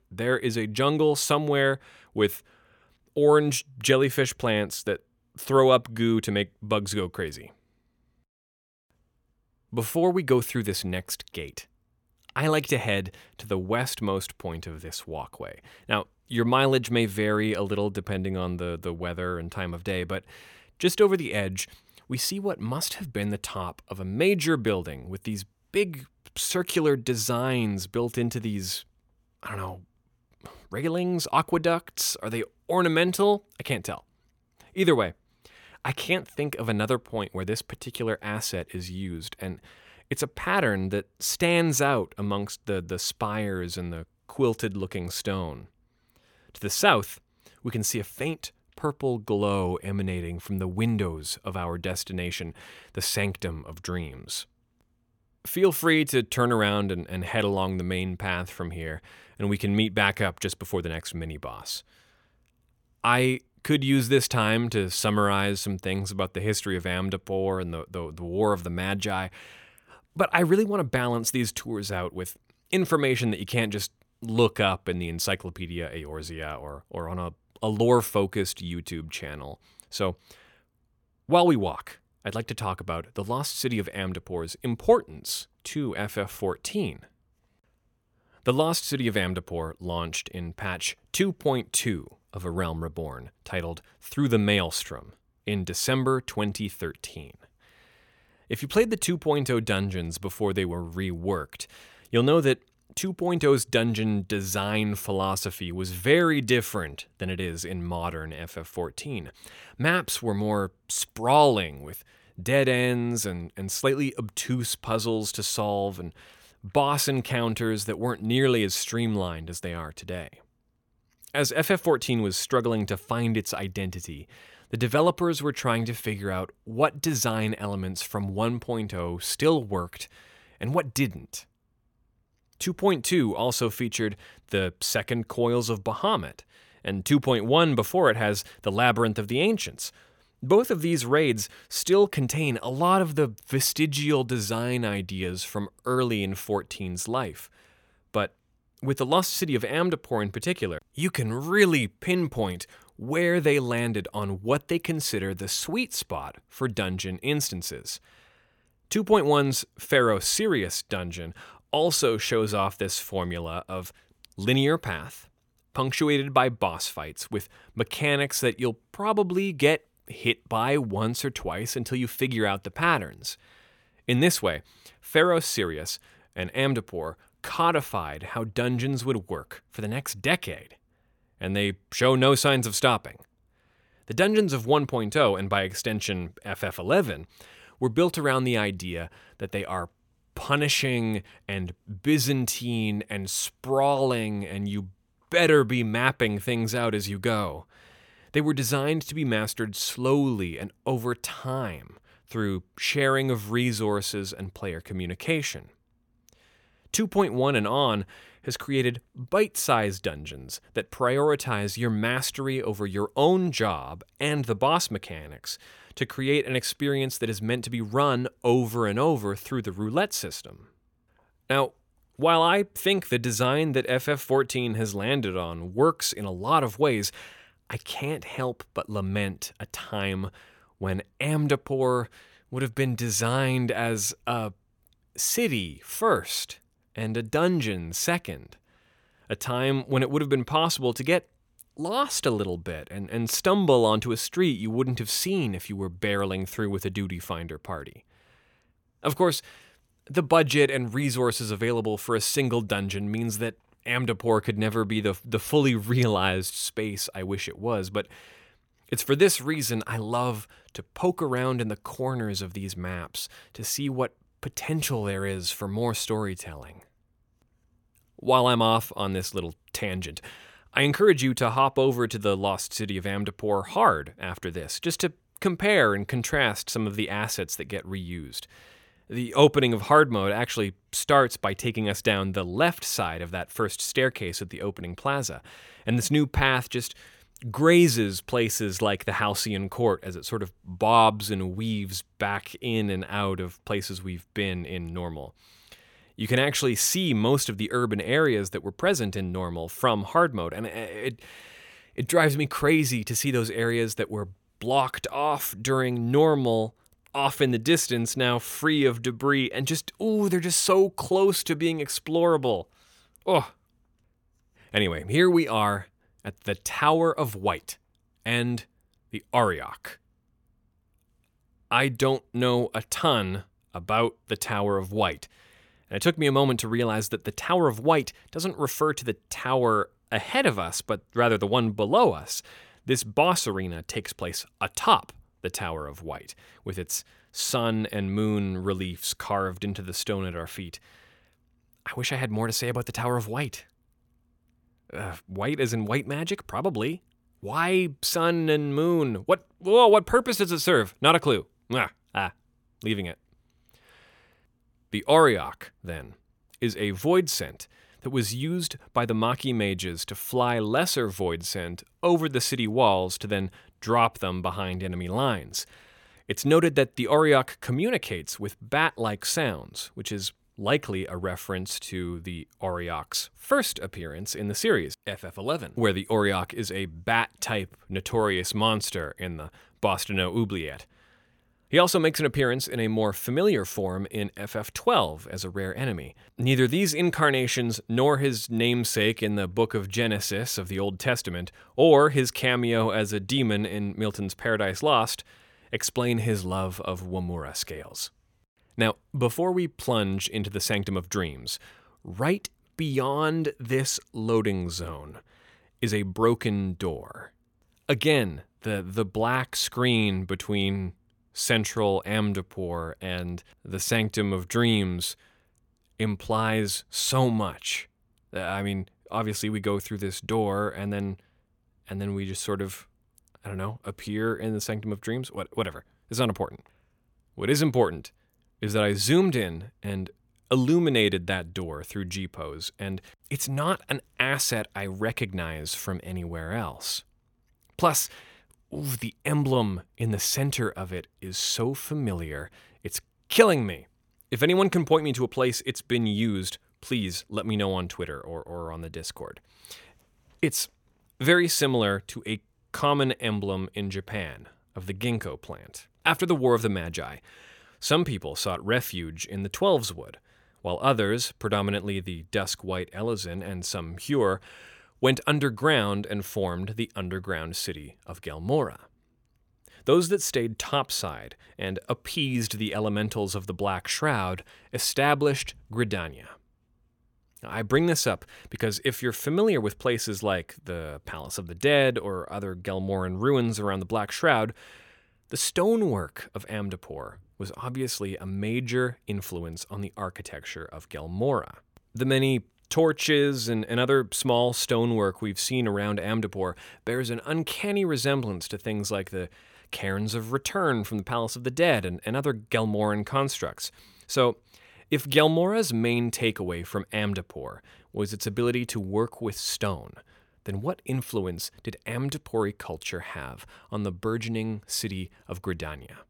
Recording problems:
none

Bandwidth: 17.5 kHz